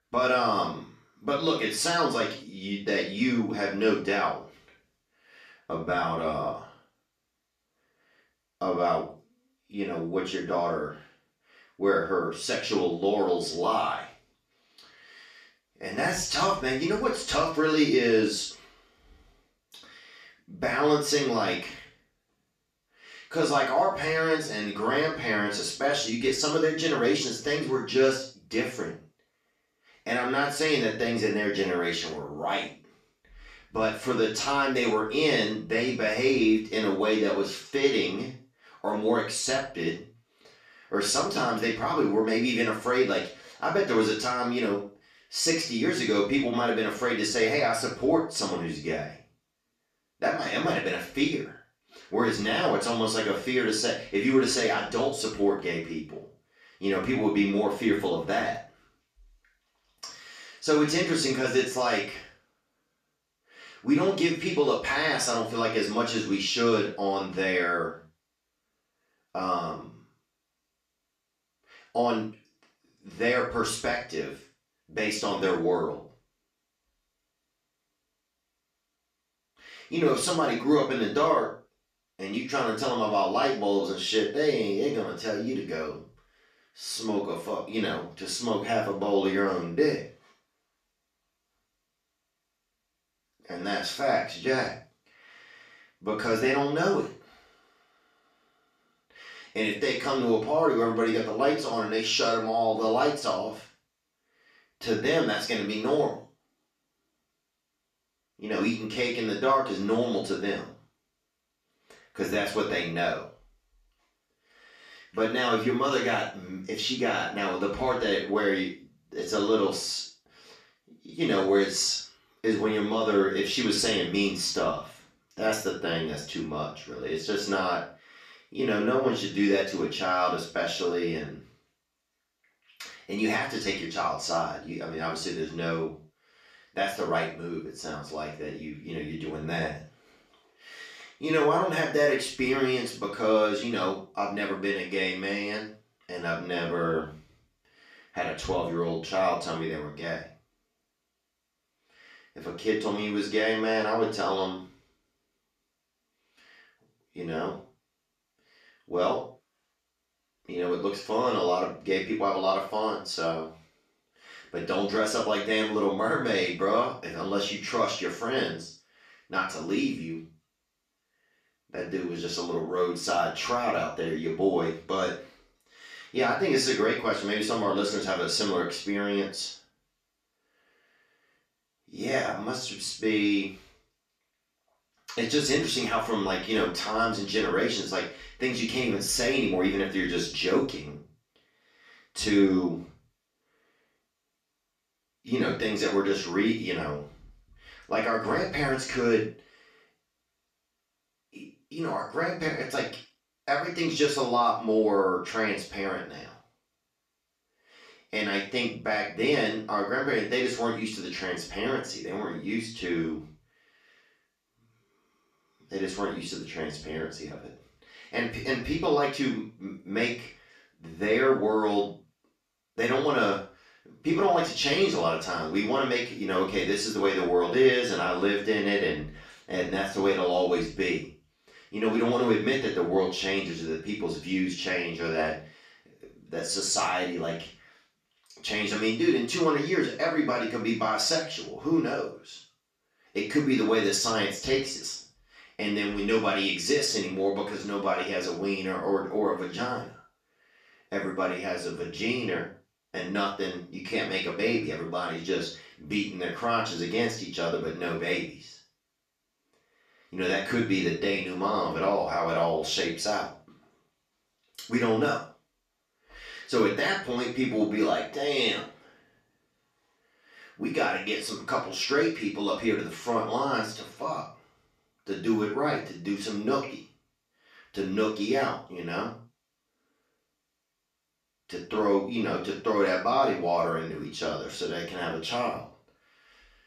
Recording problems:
off-mic speech; far
room echo; noticeable; dies away in 0.3 s

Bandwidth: 14.5 kHz